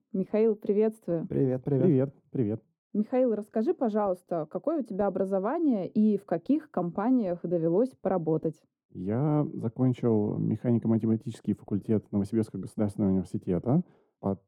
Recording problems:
muffled; very; fading above 1 kHz

